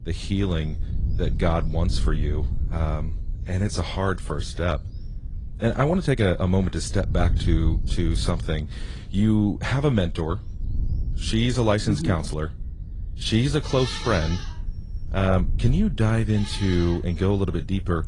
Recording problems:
garbled, watery; slightly; nothing above 10 kHz
animal sounds; noticeable; throughout; 15 dB below the speech
wind noise on the microphone; occasional gusts; 20 dB below the speech

